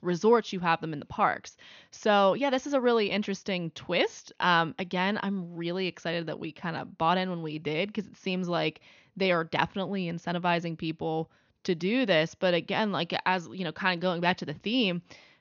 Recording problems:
high frequencies cut off; noticeable; nothing above 6.5 kHz

